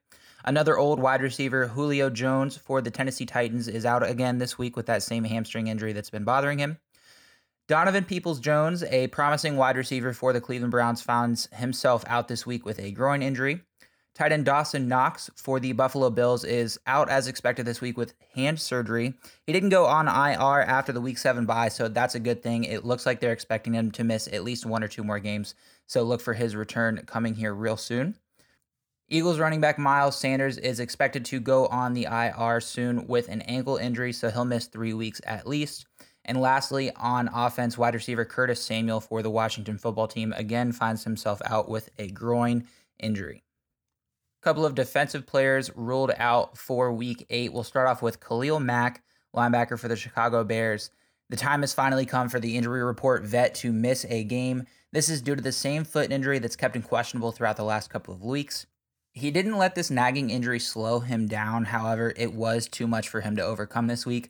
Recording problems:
none

